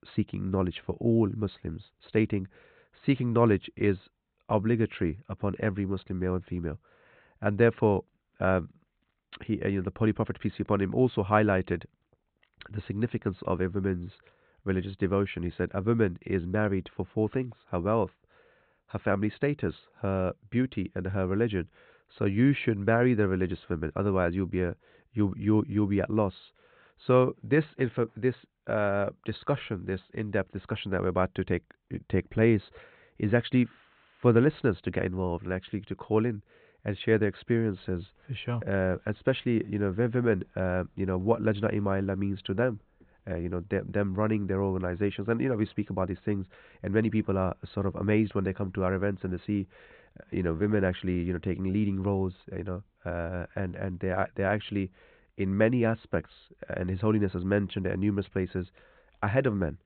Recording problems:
high frequencies cut off; severe; nothing above 4 kHz

